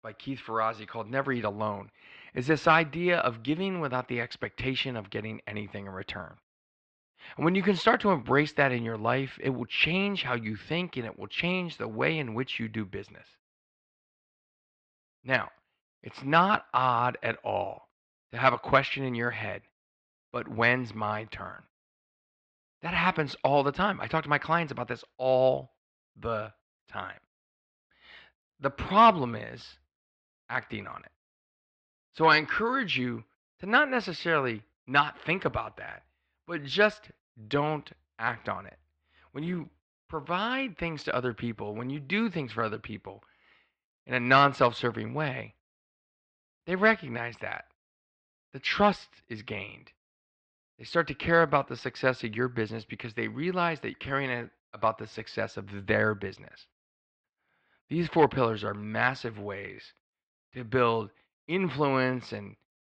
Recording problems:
muffled; slightly; fading above 4 kHz

